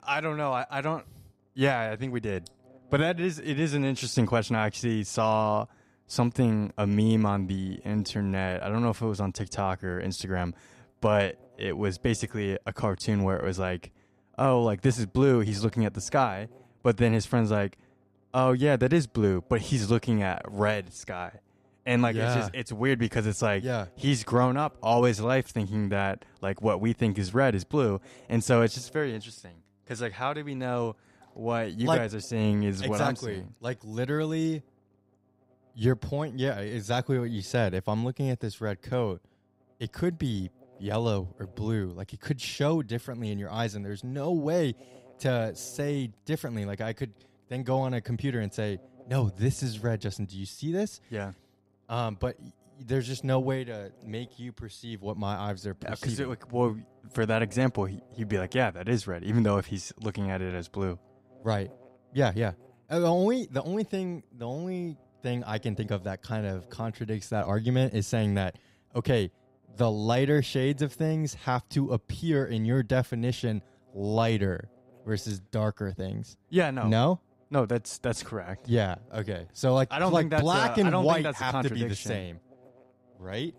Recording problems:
electrical hum; faint; throughout; 50 Hz, 30 dB below the speech

